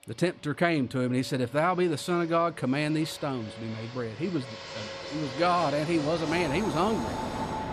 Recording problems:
train or aircraft noise; loud; throughout; 9 dB below the speech

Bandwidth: 14.5 kHz